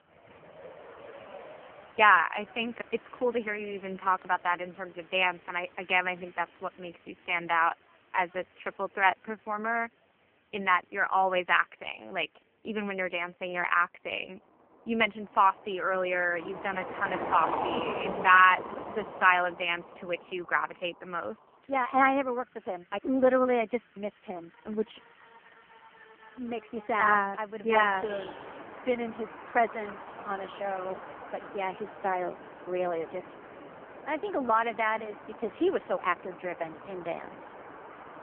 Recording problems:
phone-call audio; poor line; nothing above 3 kHz
traffic noise; noticeable; throughout; 15 dB below the speech

